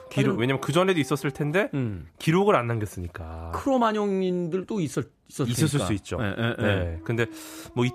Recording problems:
animal sounds; faint; throughout; 20 dB below the speech

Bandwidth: 14.5 kHz